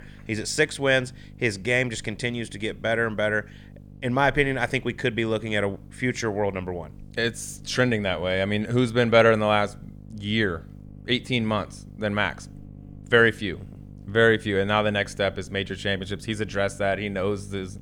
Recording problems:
electrical hum; faint; throughout; 50 Hz, 30 dB below the speech

